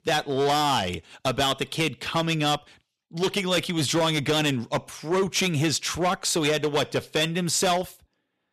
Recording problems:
distortion; heavy; 11% of the sound clipped

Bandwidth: 14 kHz